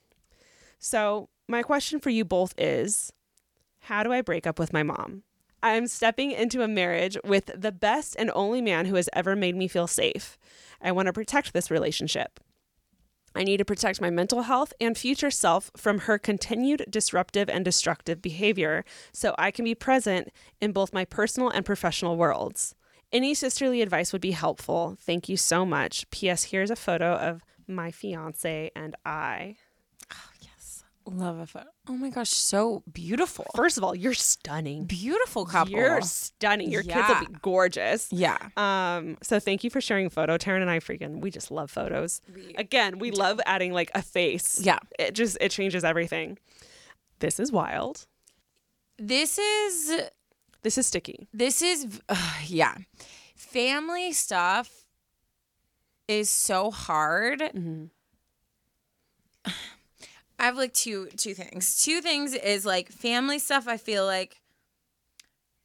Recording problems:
none

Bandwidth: 18.5 kHz